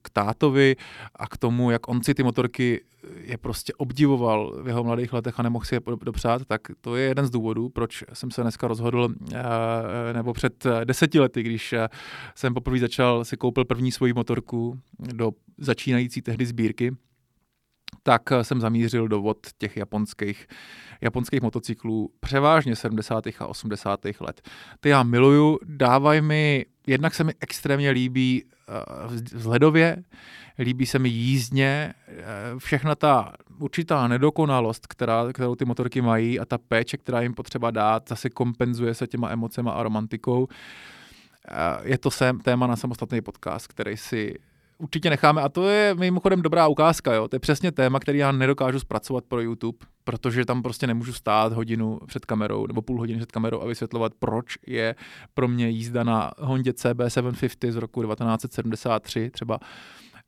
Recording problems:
none

